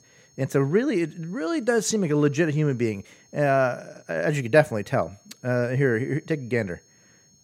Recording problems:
high-pitched whine; faint; throughout; 6.5 kHz, 30 dB below the speech

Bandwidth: 16.5 kHz